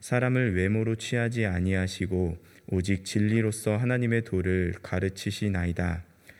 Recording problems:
none

